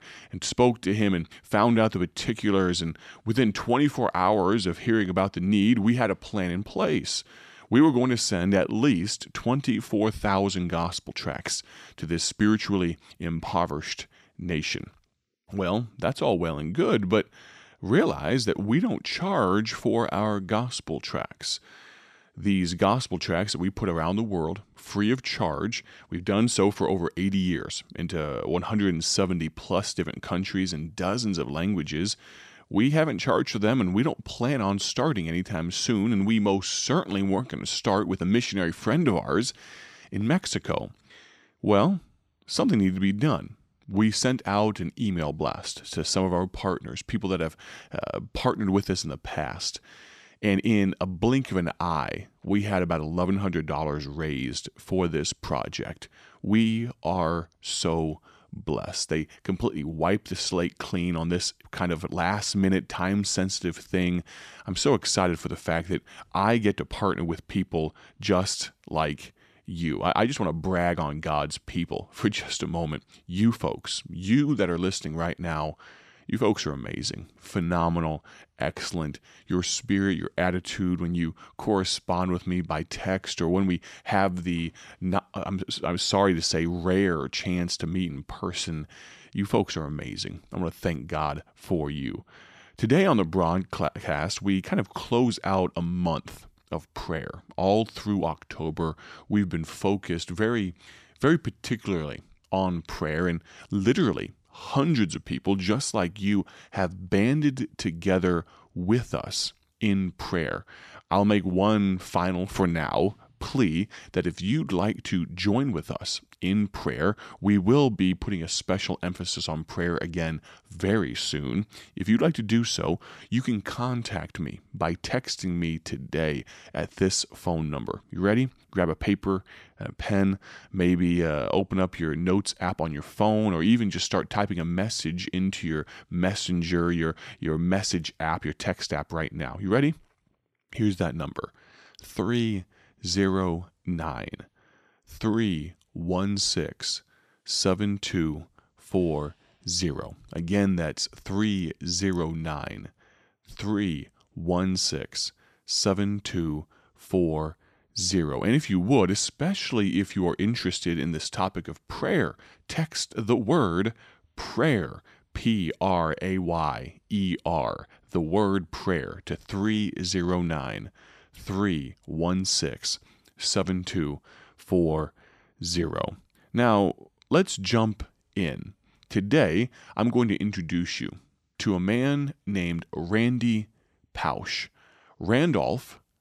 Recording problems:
none

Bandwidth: 14.5 kHz